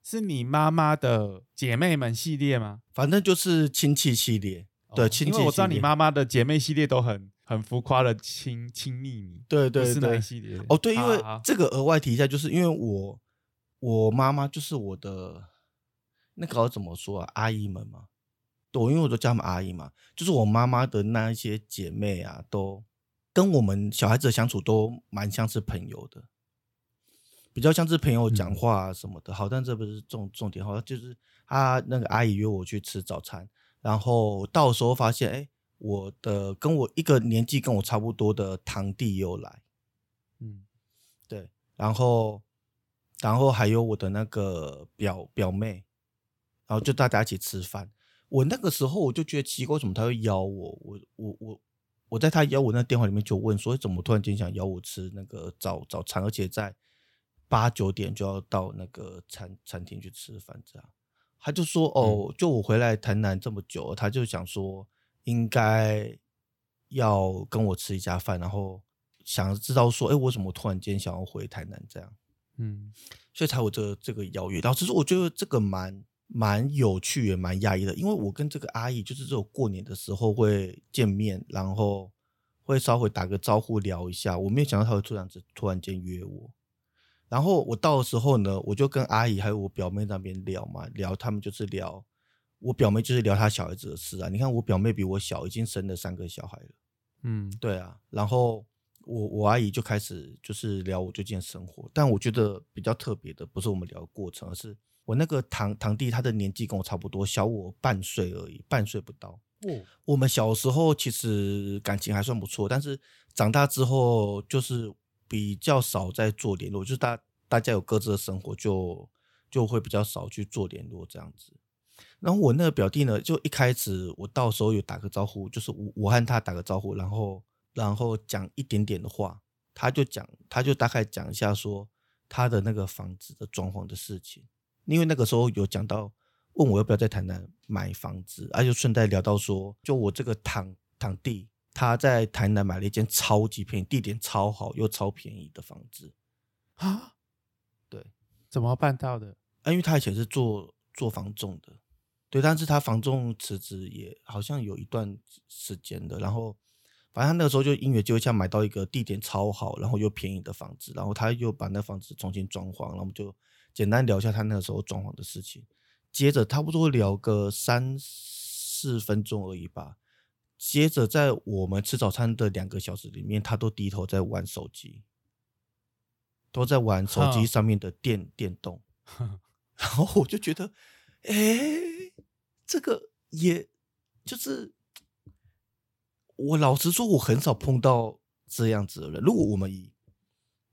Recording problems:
none

